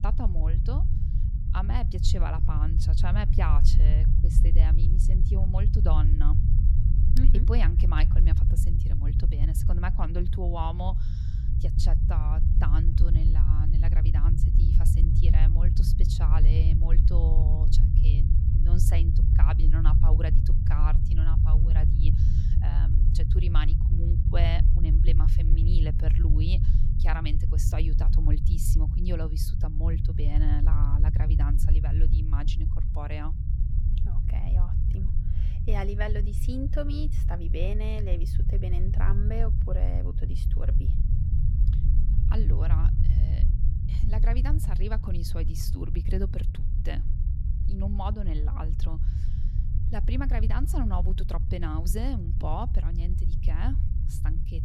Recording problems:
low rumble; loud; throughout; 3 dB below the speech

